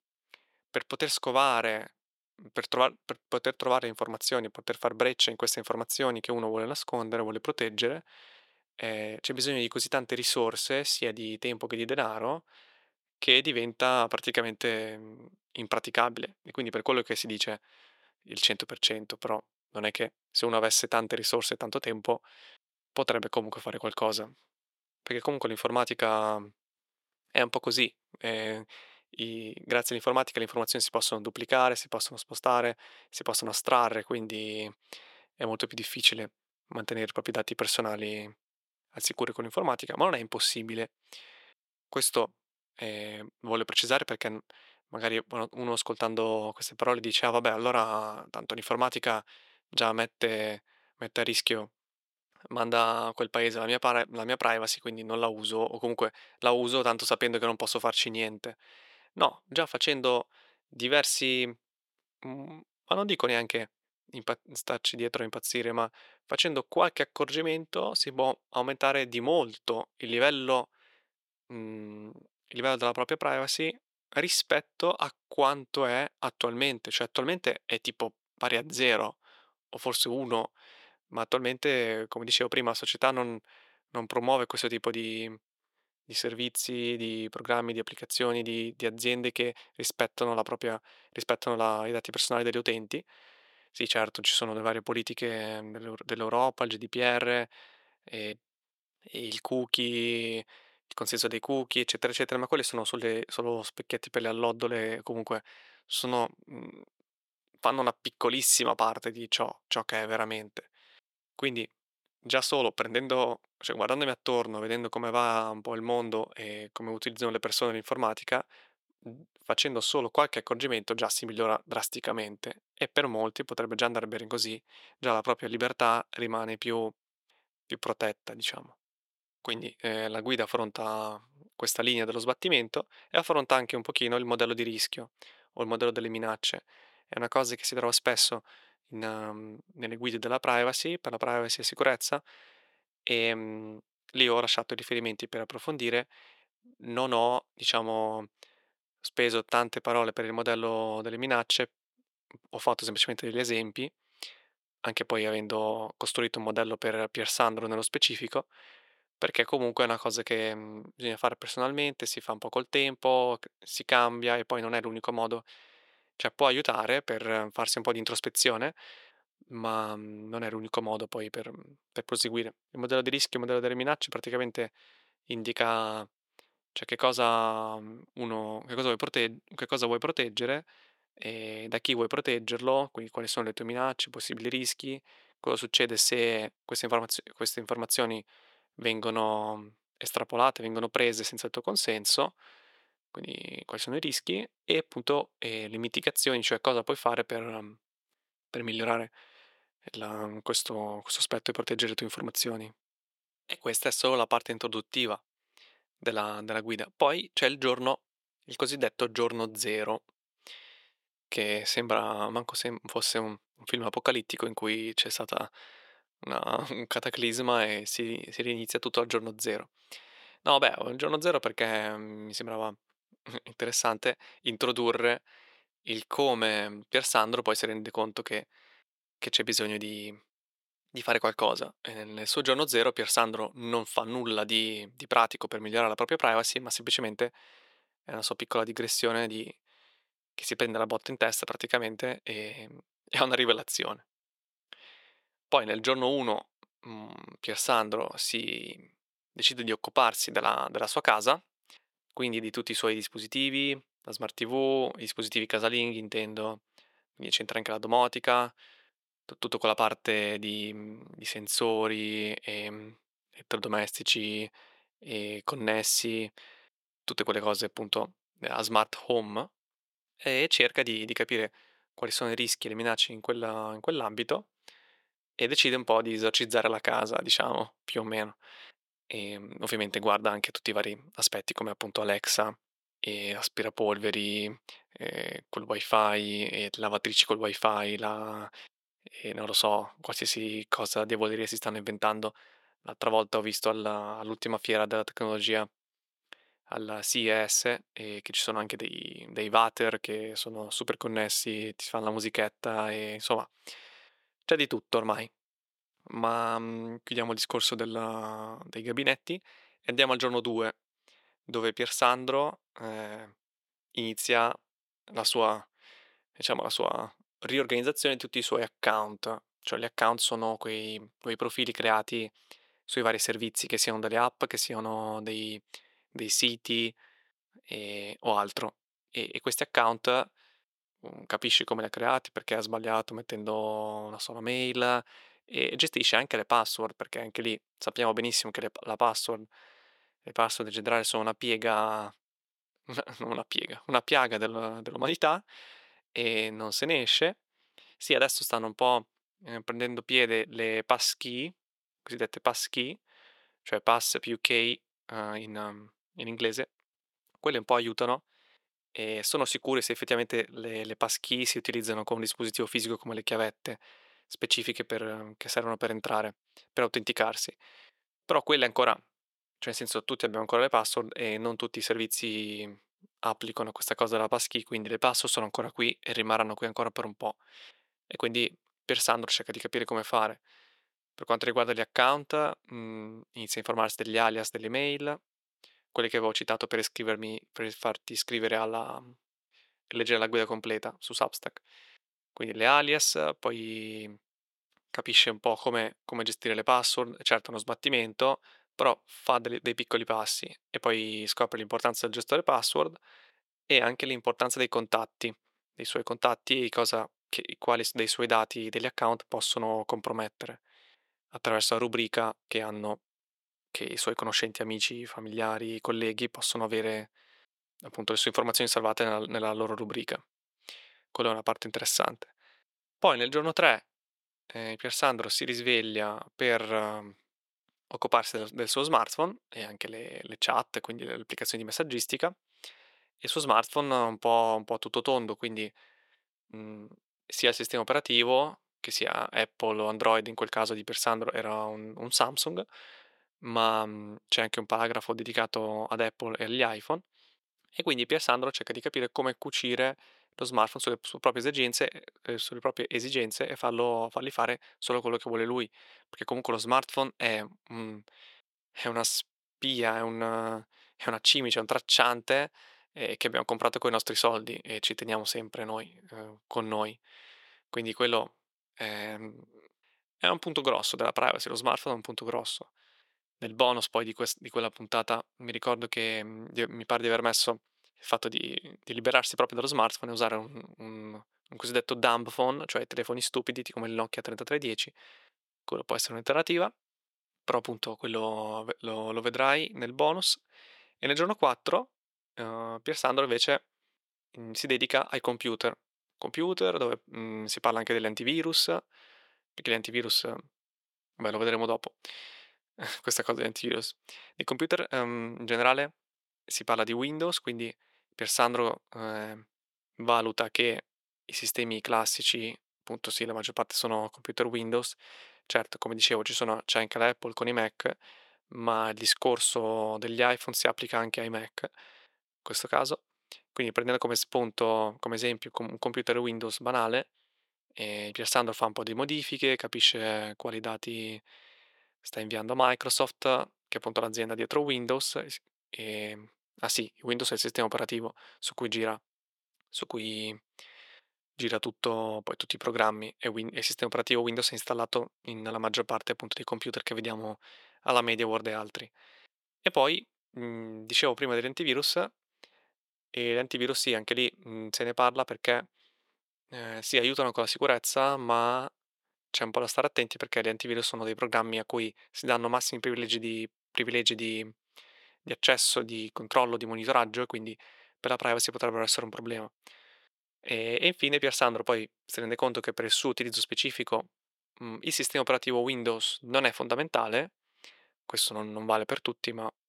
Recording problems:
thin; very; fading below 450 Hz

